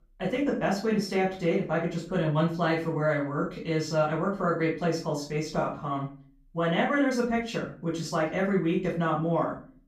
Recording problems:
off-mic speech; far
room echo; slight; dies away in 0.3 s

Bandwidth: 15.5 kHz